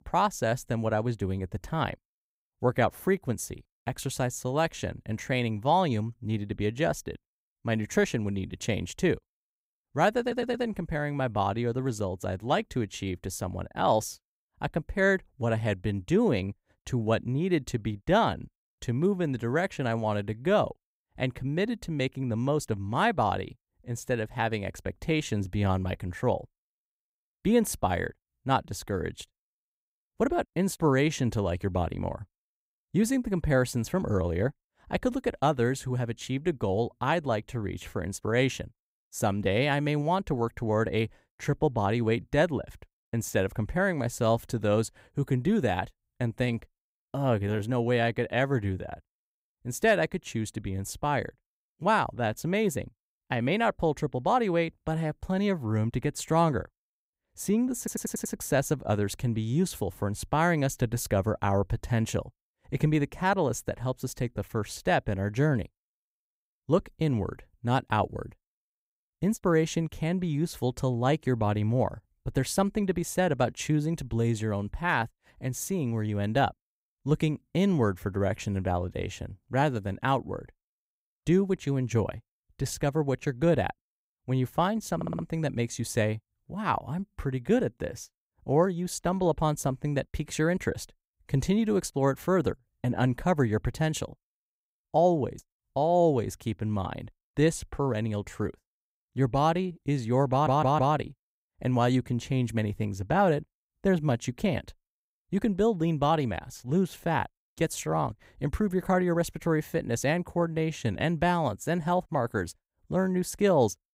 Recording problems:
audio stuttering; 4 times, first at 10 s

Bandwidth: 15.5 kHz